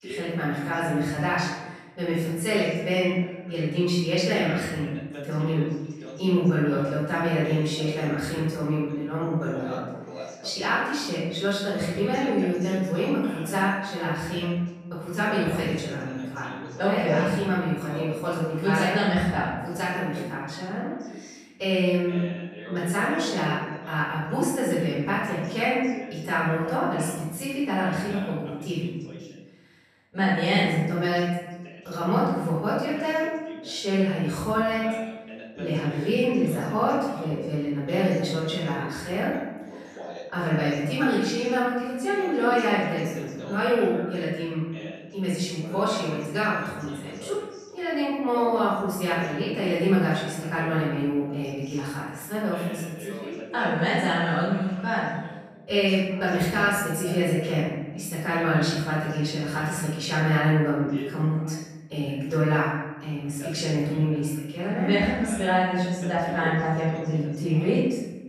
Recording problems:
room echo; strong; dies away in 1 s
off-mic speech; far
voice in the background; noticeable; throughout; 15 dB below the speech

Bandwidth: 14.5 kHz